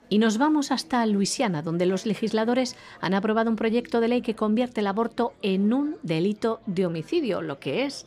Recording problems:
murmuring crowd; faint; throughout; 25 dB below the speech

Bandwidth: 15 kHz